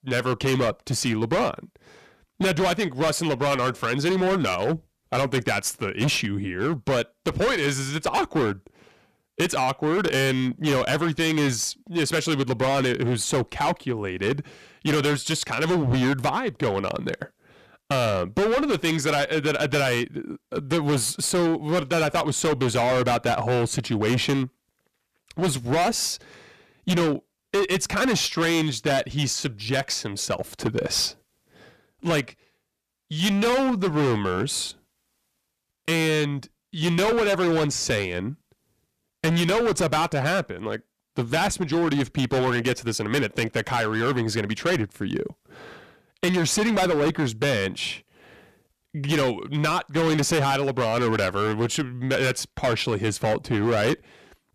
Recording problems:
distortion; heavy; 17% of the sound clipped

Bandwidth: 14.5 kHz